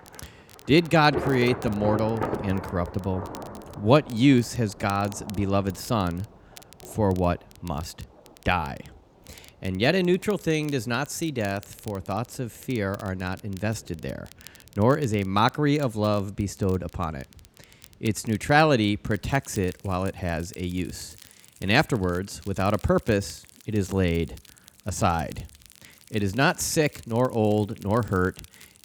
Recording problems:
rain or running water; noticeable; throughout; 10 dB below the speech
crackle, like an old record; faint; 25 dB below the speech

